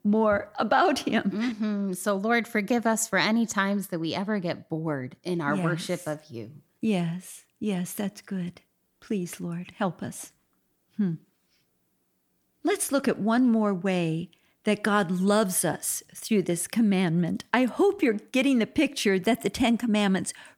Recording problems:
none

